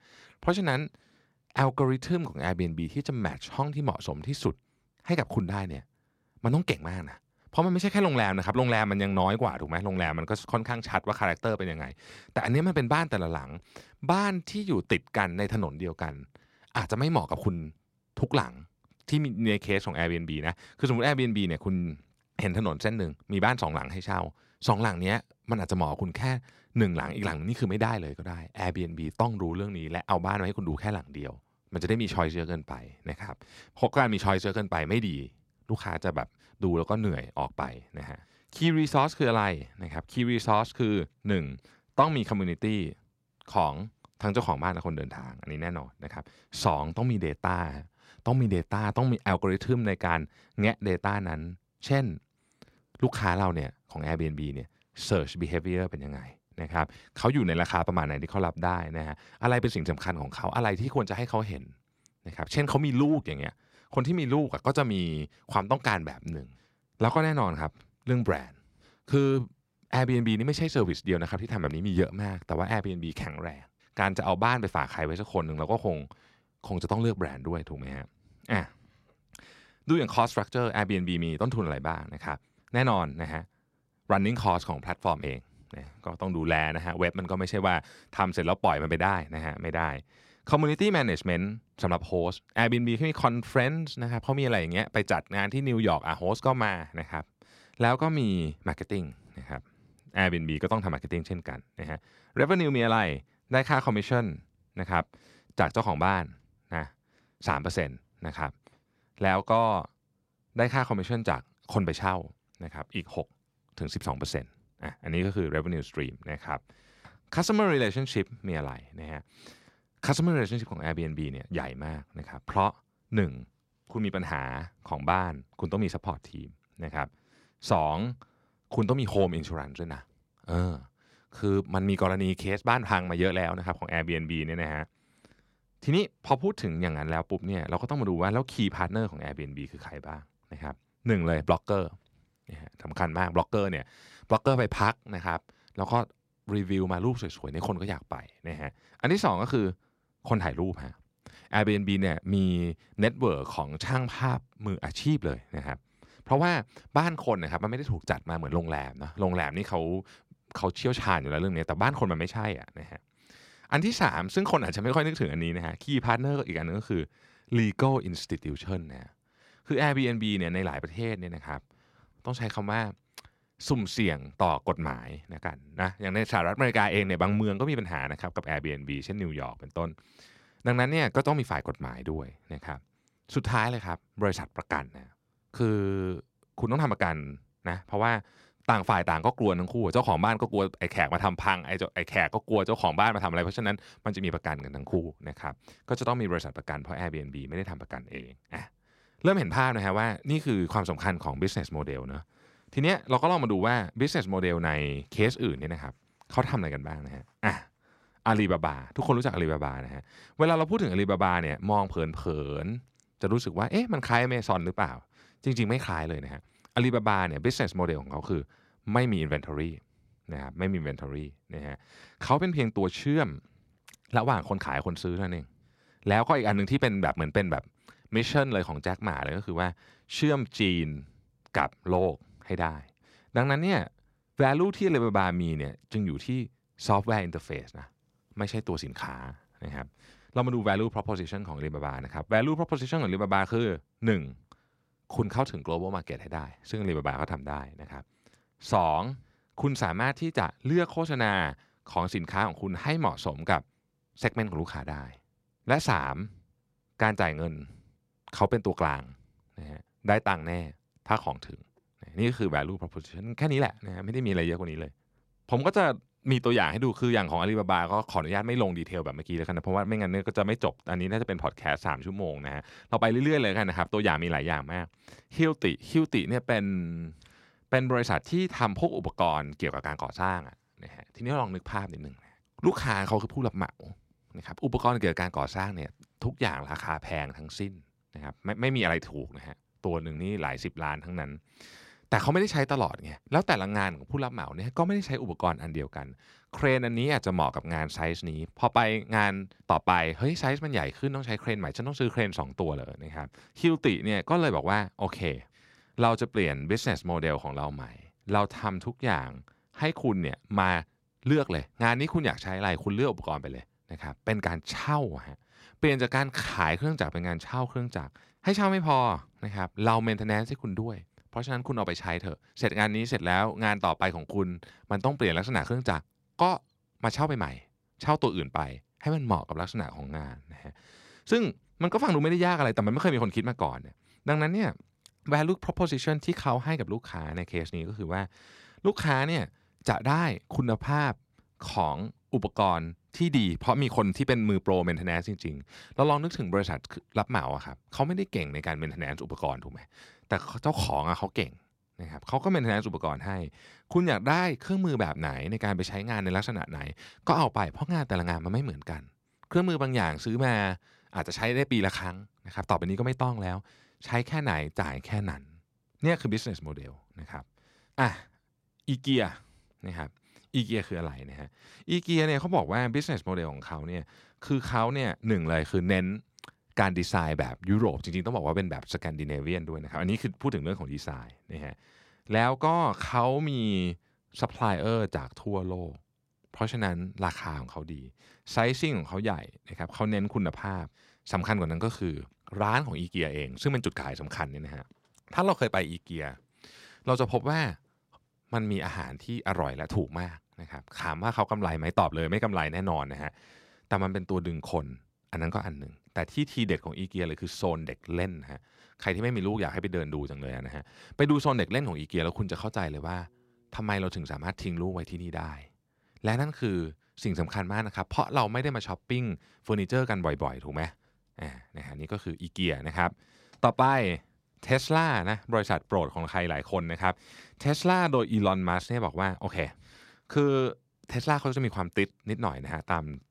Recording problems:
none

